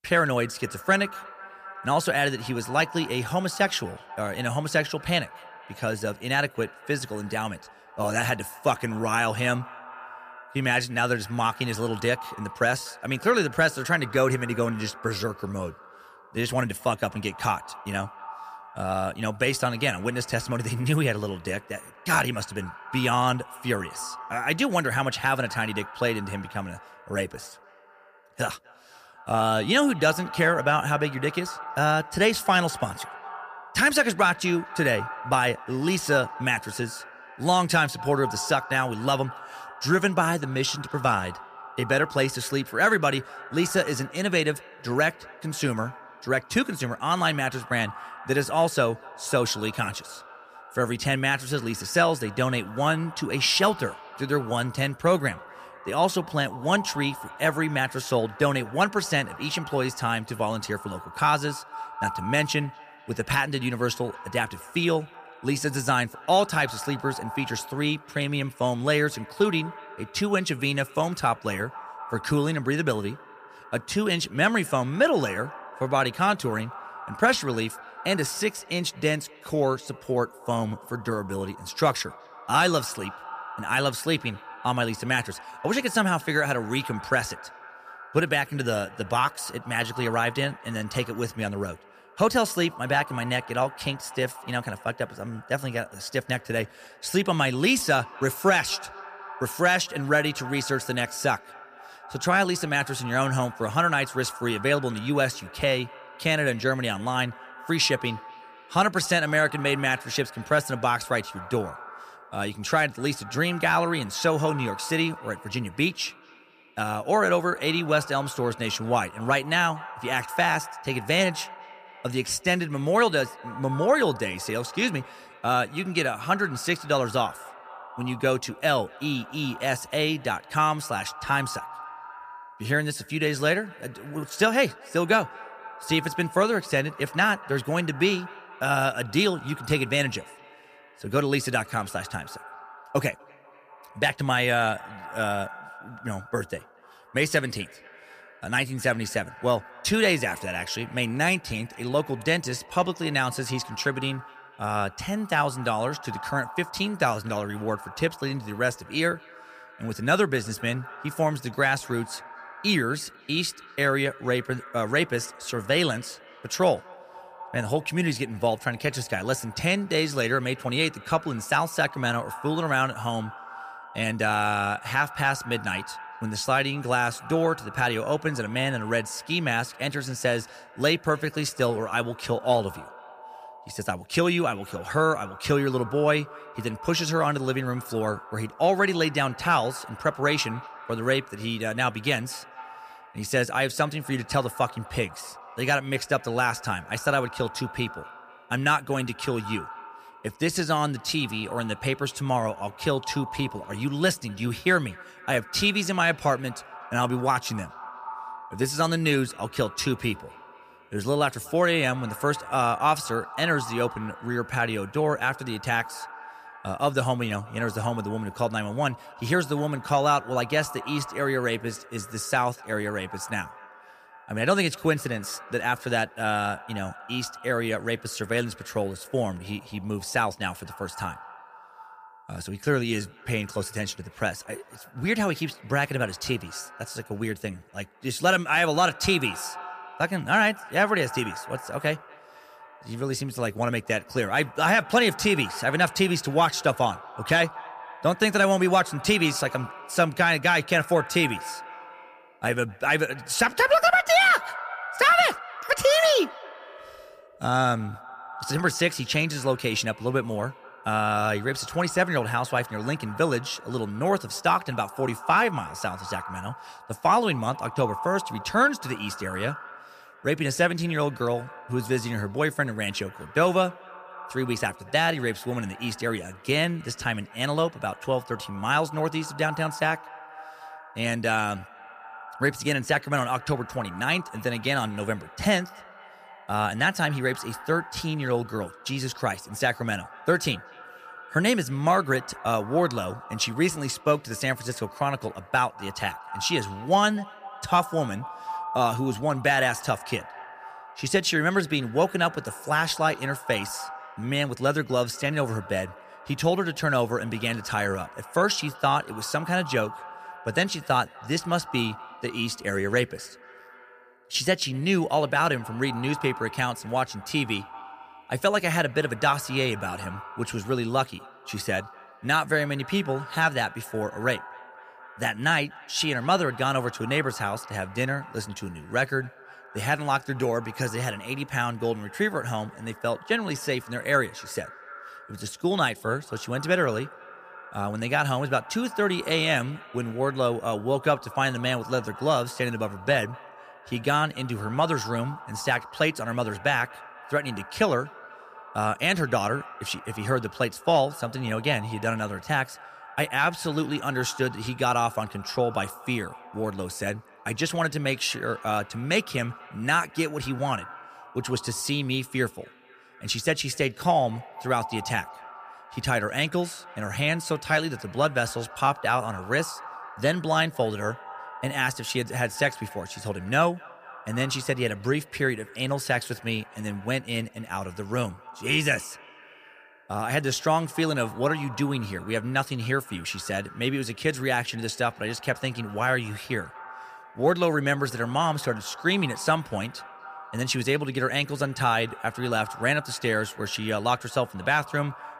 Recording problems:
echo of what is said; noticeable; throughout; 240 ms later, 15 dB below the speech

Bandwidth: 15 kHz